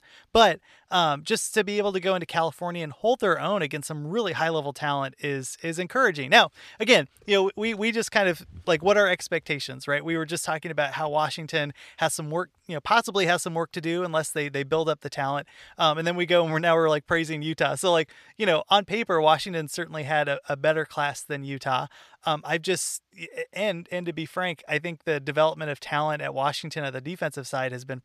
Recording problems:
none

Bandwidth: 14.5 kHz